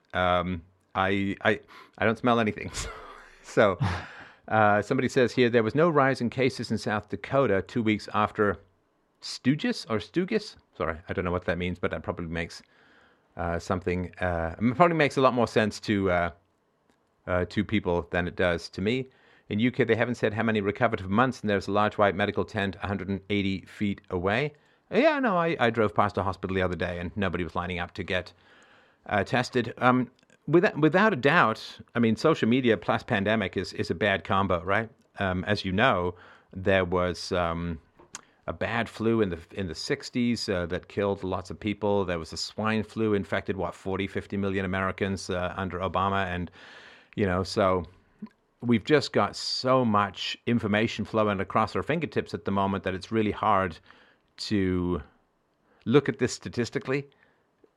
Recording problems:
muffled; very slightly; fading above 3.5 kHz

